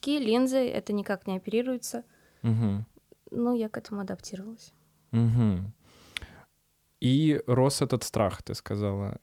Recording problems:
none

